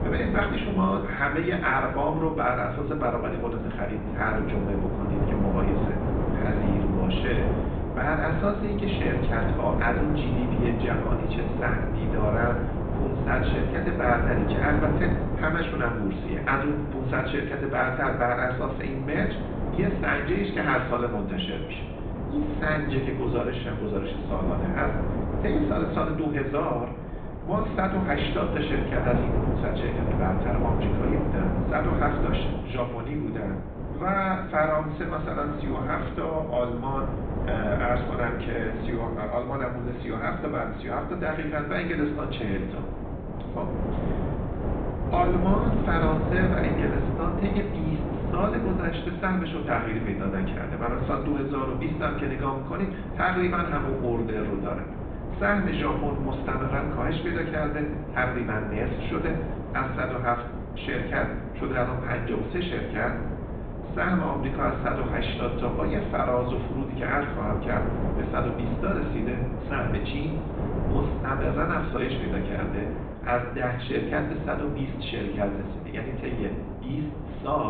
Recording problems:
high frequencies cut off; severe; nothing above 4 kHz
room echo; slight; dies away in 0.8 s
off-mic speech; somewhat distant
wind noise on the microphone; heavy; 7 dB below the speech
abrupt cut into speech; at the end

